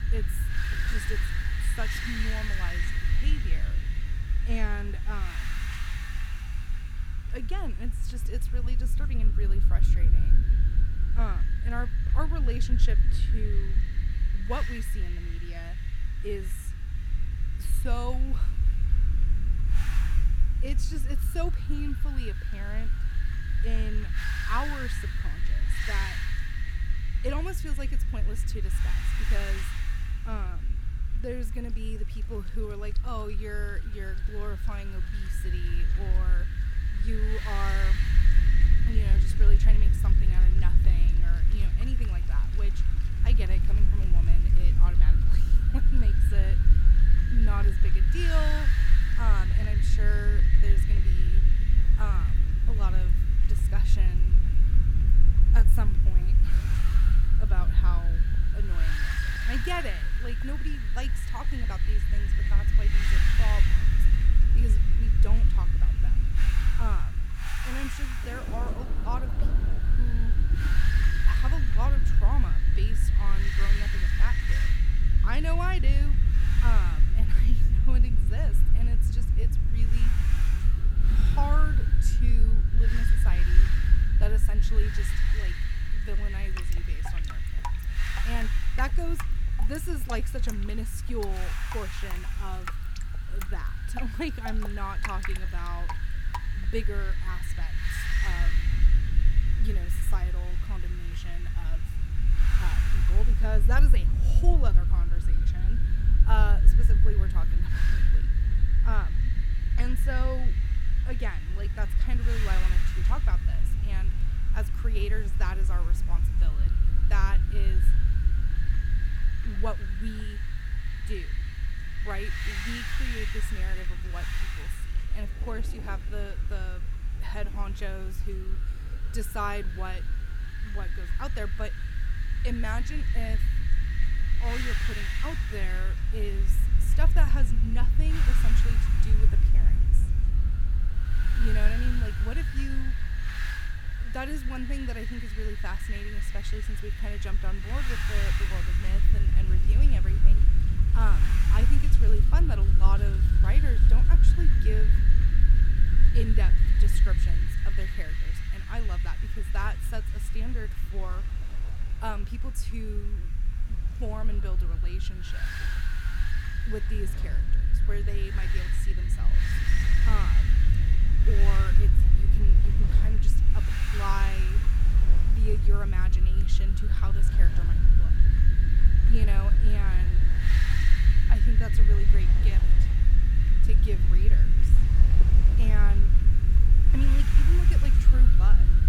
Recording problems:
wind noise on the microphone; heavy; 1 dB below the speech
low rumble; loud; throughout; 8 dB below the speech
rain or running water; noticeable; throughout; 10 dB below the speech

